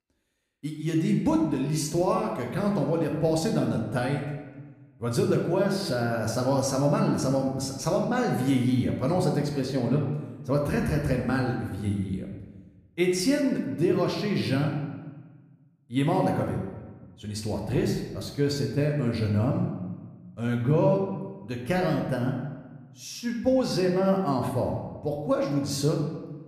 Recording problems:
room echo; noticeable; dies away in 1 s
off-mic speech; somewhat distant

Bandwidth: 14.5 kHz